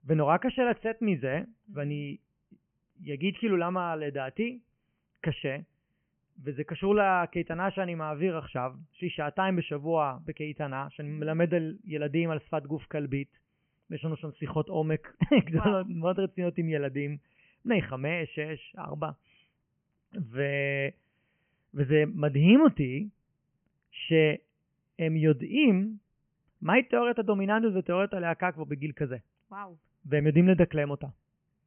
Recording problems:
high frequencies cut off; severe; nothing above 3 kHz

